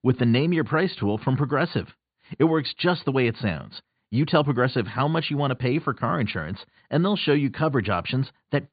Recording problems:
high frequencies cut off; severe; nothing above 4.5 kHz

